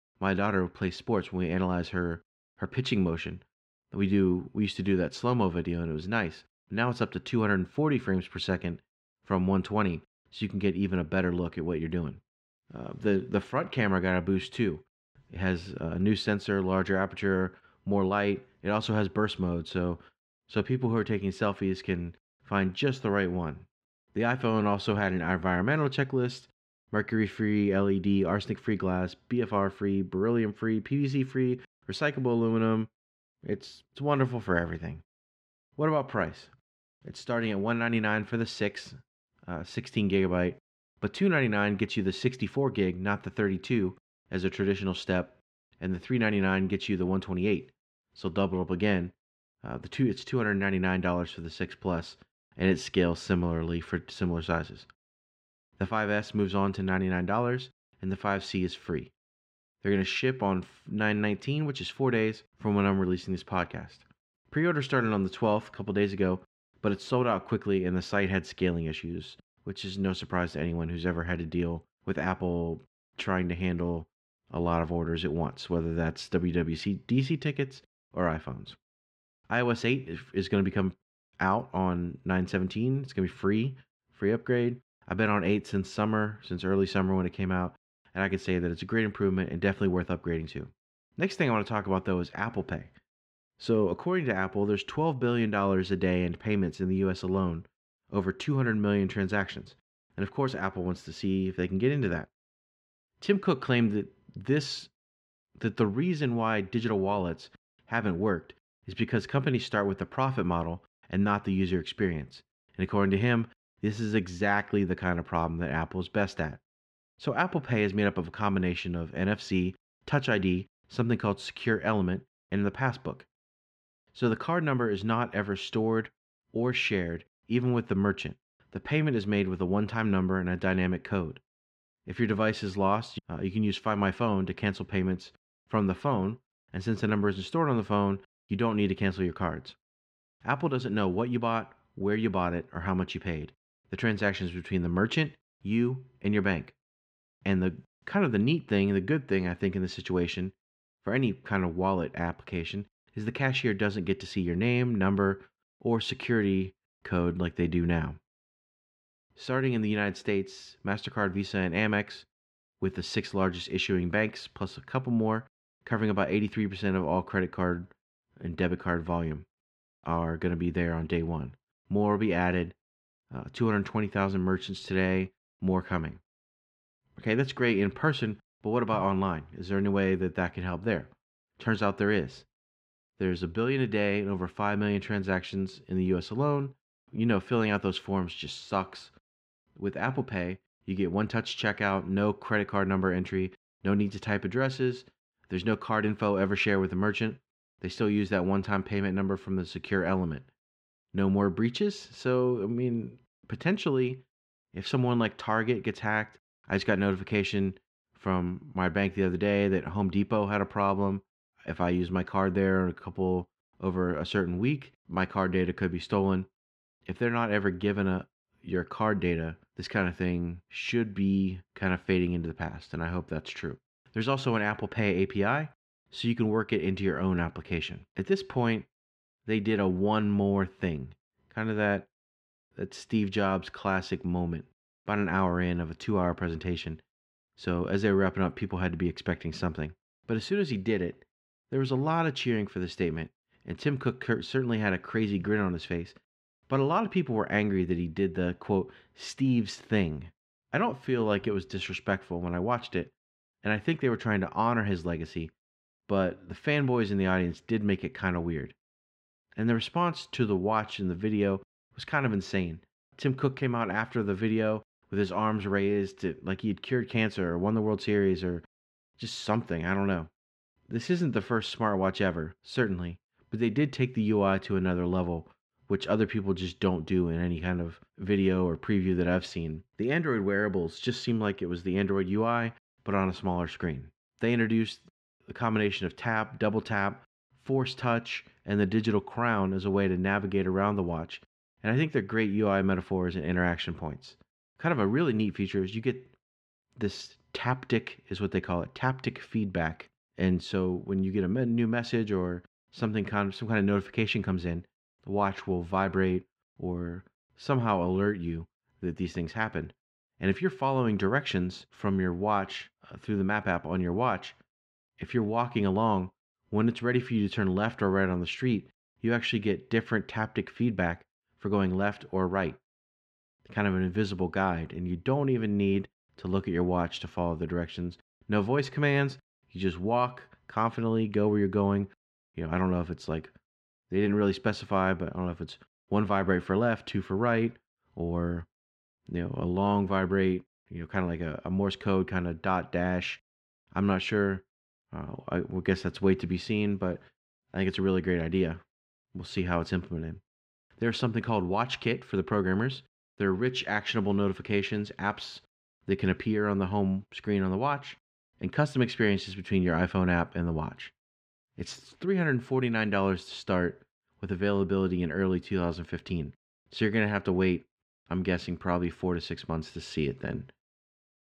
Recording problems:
muffled; slightly; fading above 2.5 kHz

